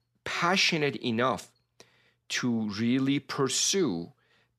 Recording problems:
none

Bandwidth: 14 kHz